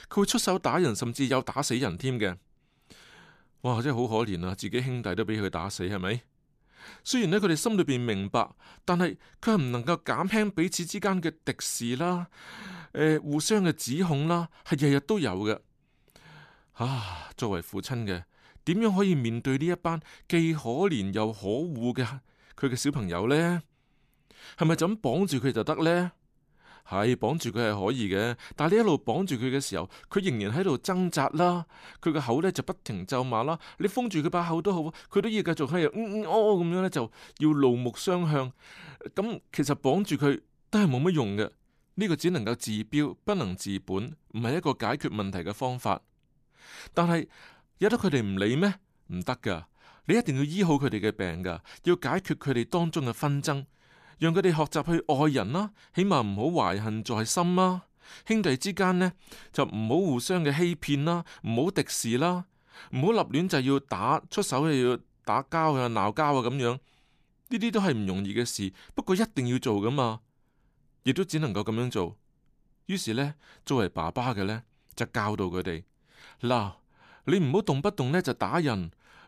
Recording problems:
none

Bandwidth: 14.5 kHz